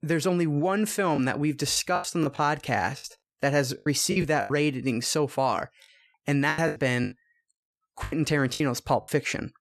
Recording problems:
choppy; very; 11% of the speech affected

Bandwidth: 13.5 kHz